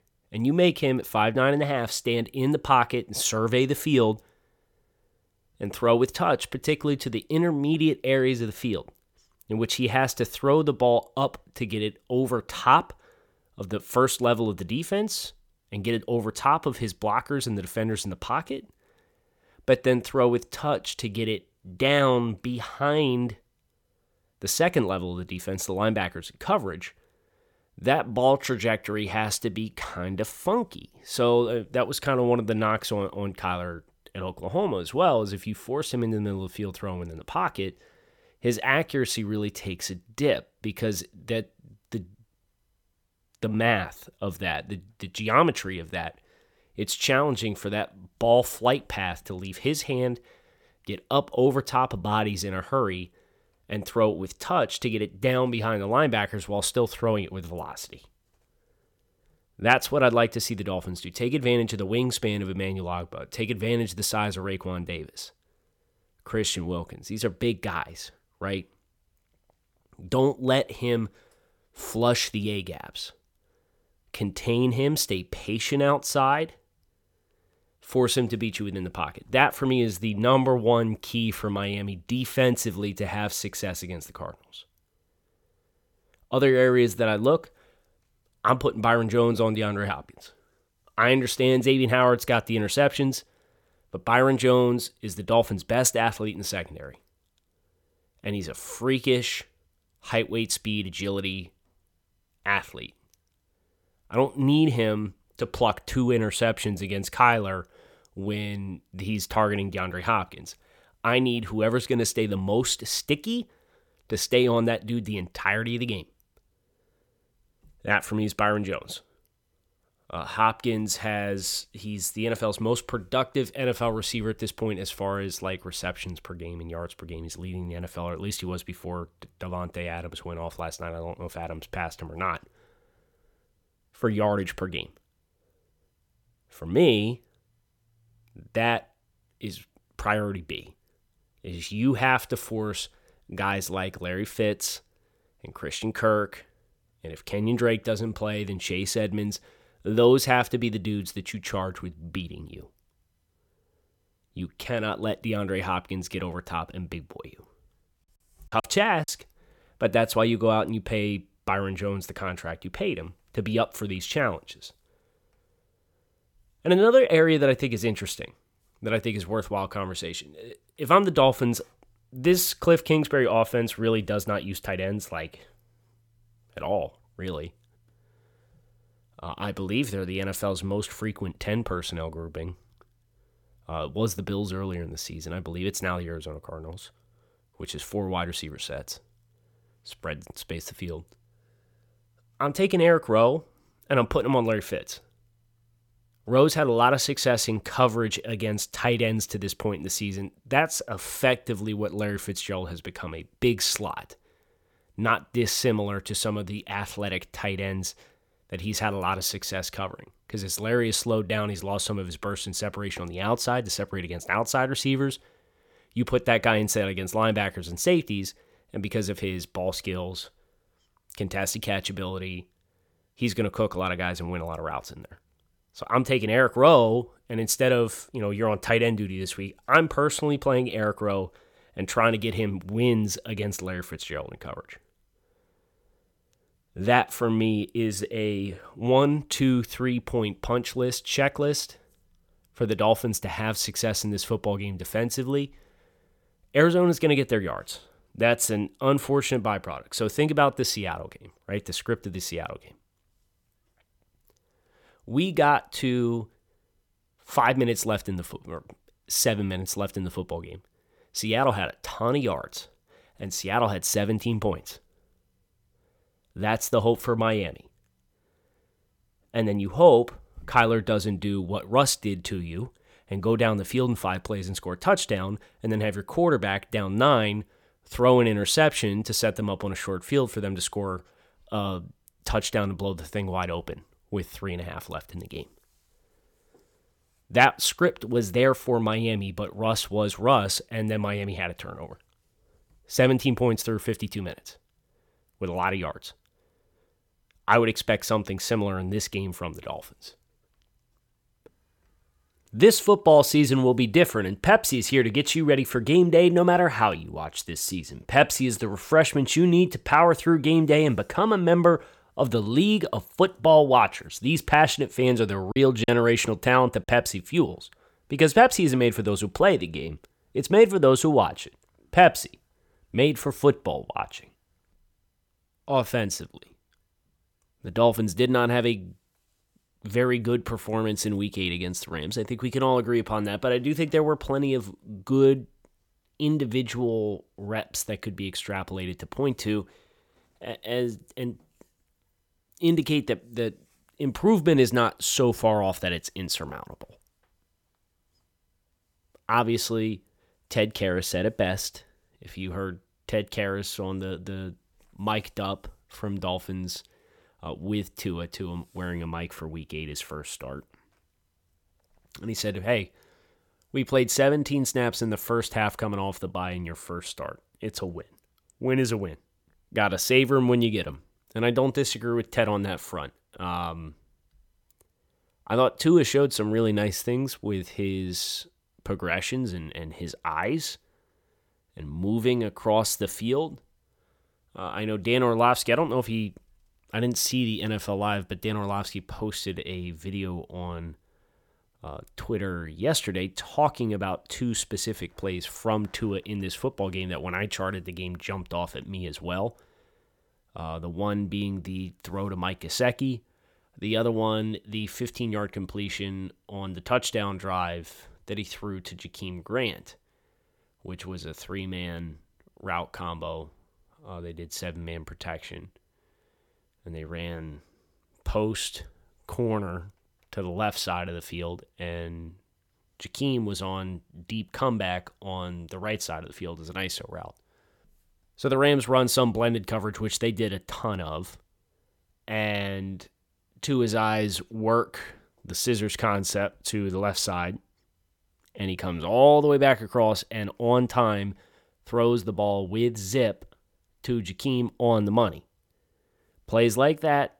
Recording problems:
choppy; very; at 2:38 and at 5:16; 10% of the speech affected

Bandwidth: 17.5 kHz